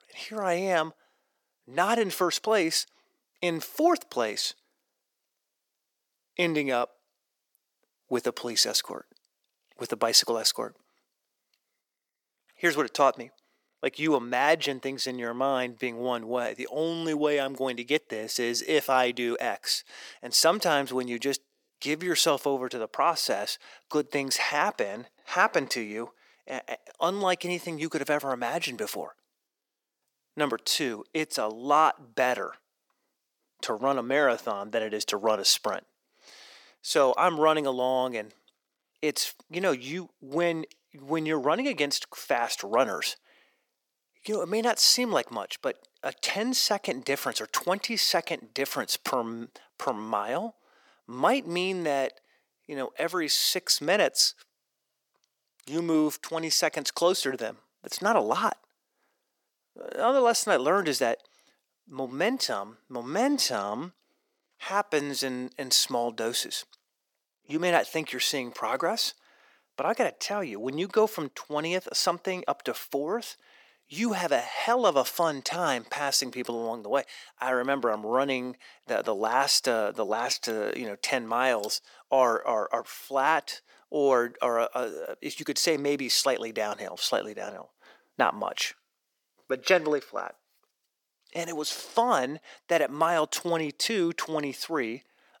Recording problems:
thin; somewhat; fading below 350 Hz

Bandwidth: 17.5 kHz